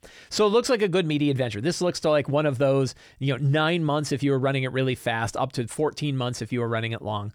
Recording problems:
none

